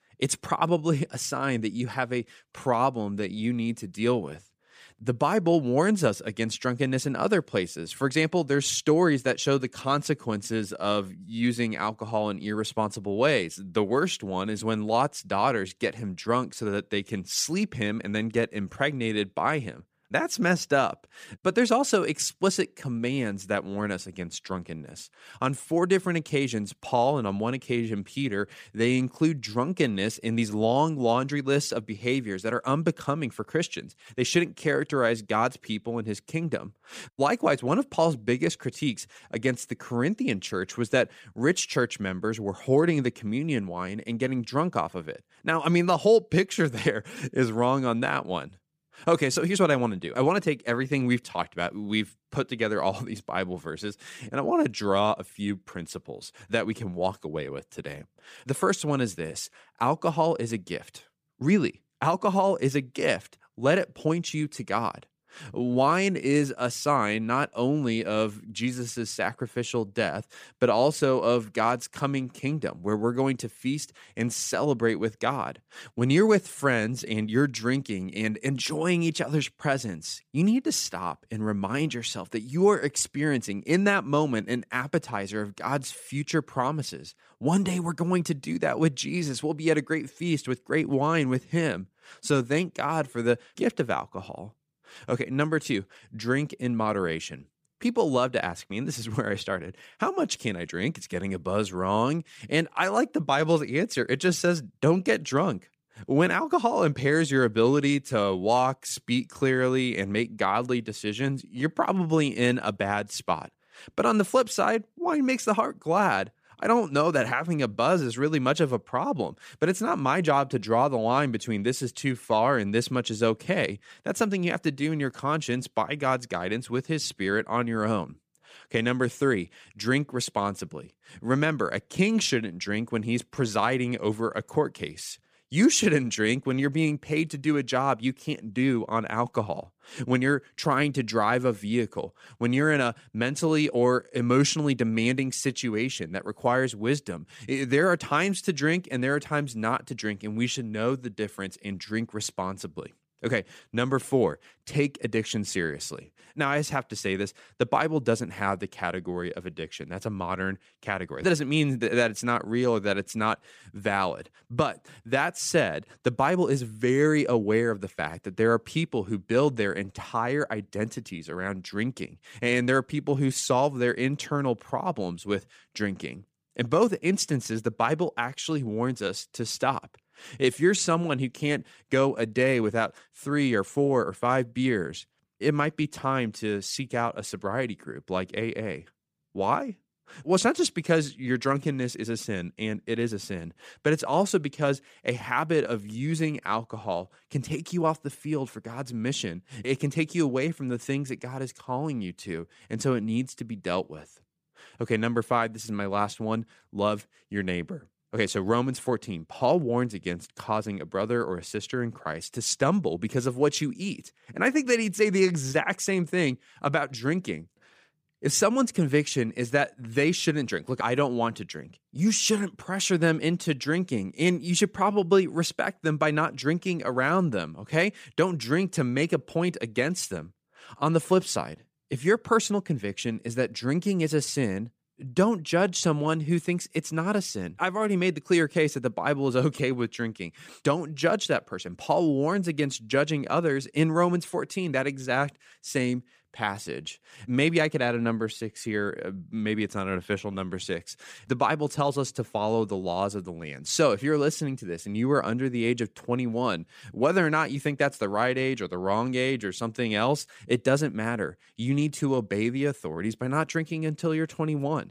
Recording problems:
none

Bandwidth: 15 kHz